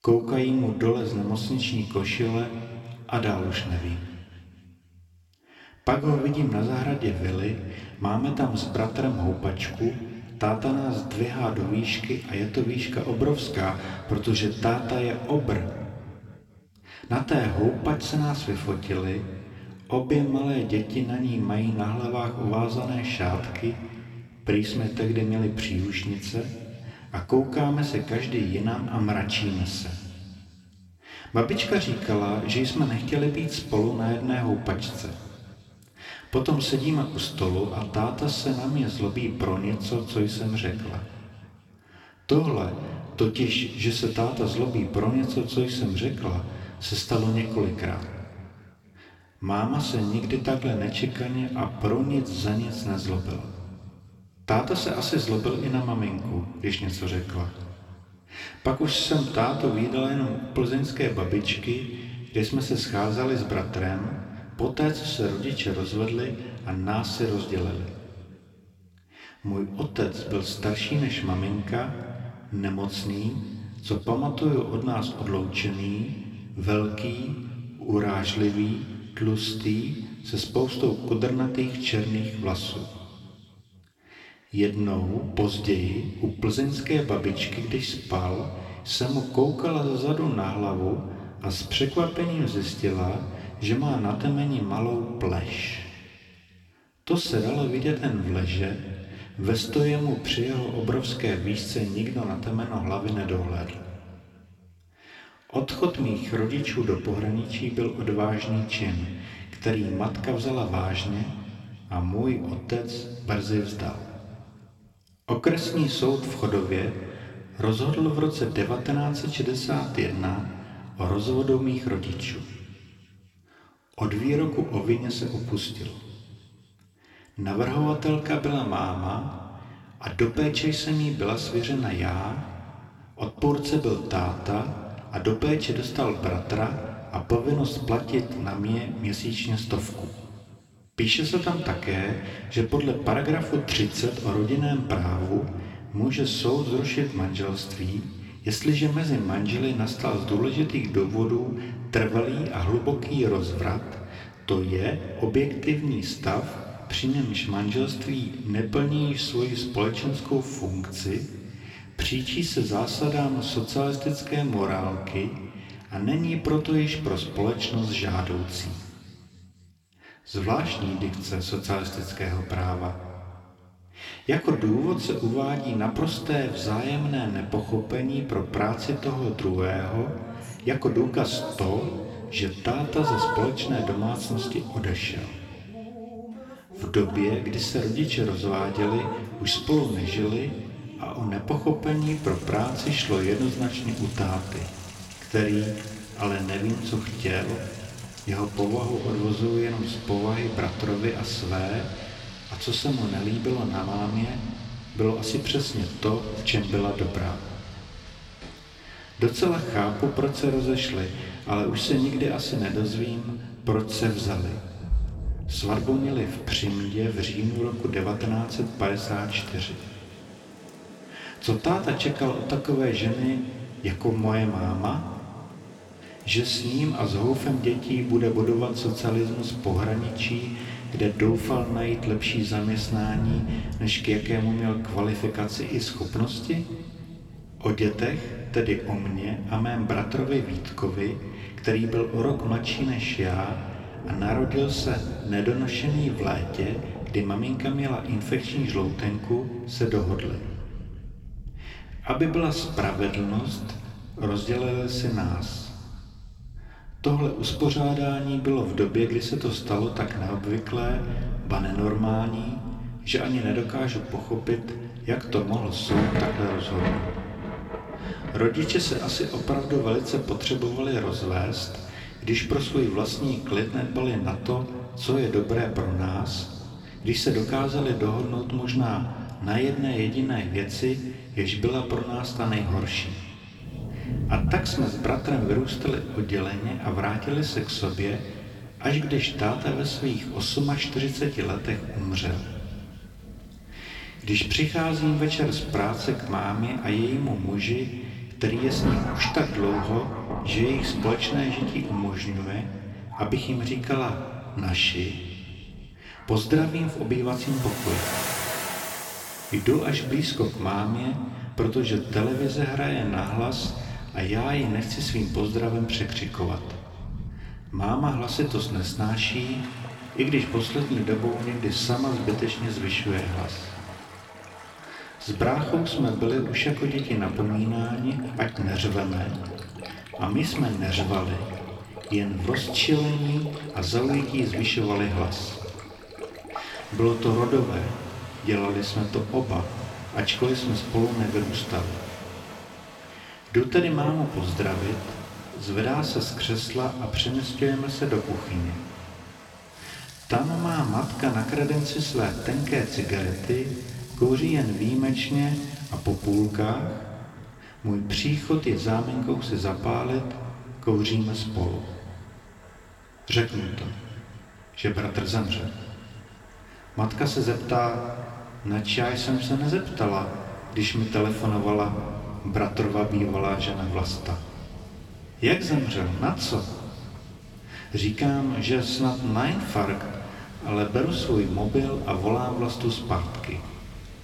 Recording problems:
room echo; slight; dies away in 2 s
off-mic speech; somewhat distant
rain or running water; noticeable; from 3:00 on; 10 dB below the speech

